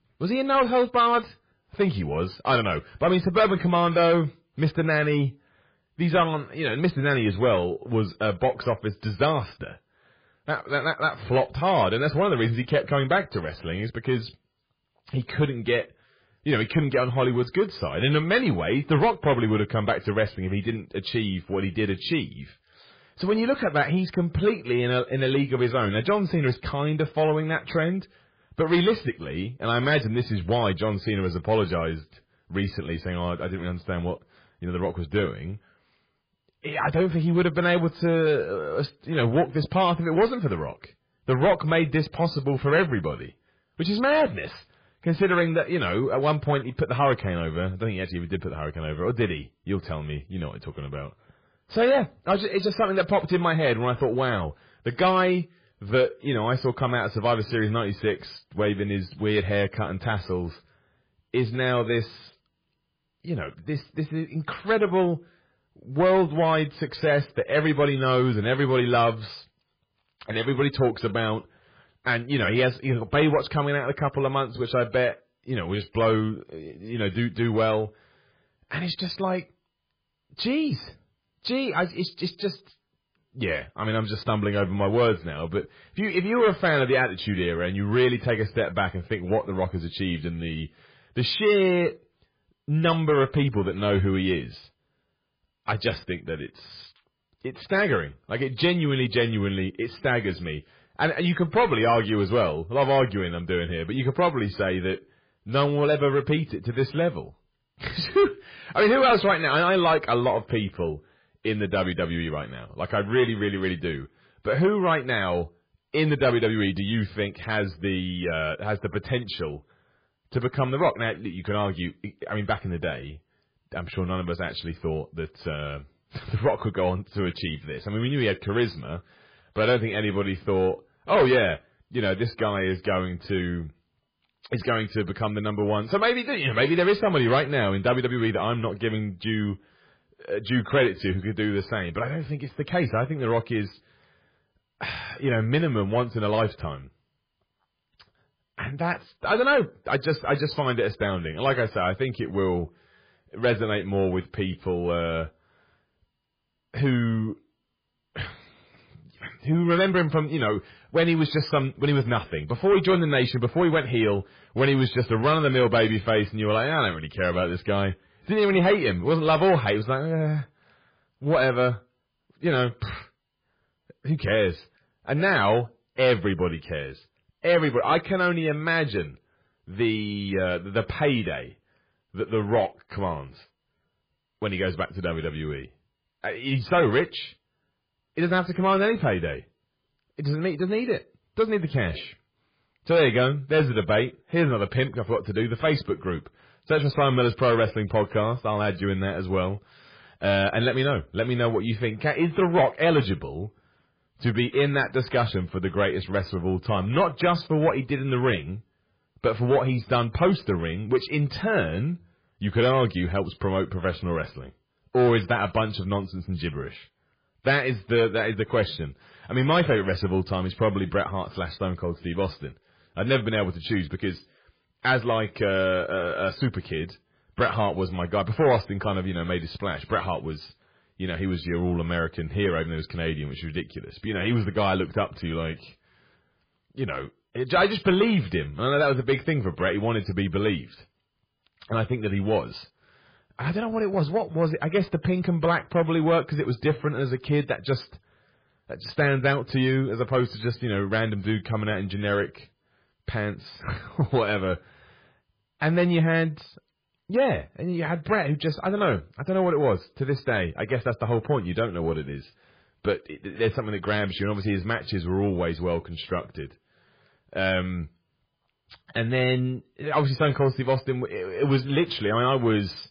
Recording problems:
garbled, watery; badly
distortion; slight; 10 dB below the speech

